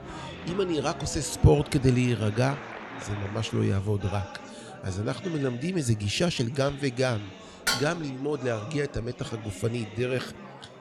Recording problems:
murmuring crowd; noticeable; throughout; 15 dB below the speech
clattering dishes; loud; at 7.5 s; peak level with the speech

